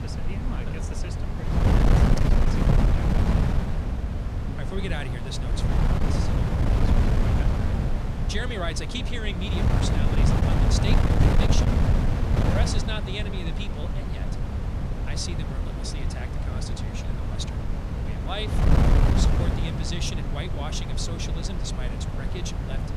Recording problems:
wind noise on the microphone; heavy; 2 dB above the speech

